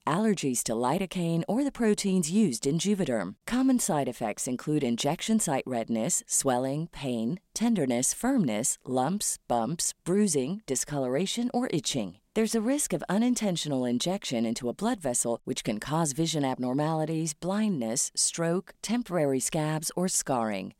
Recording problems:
none

